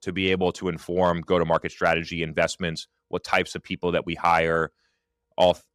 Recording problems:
none

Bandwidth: 15 kHz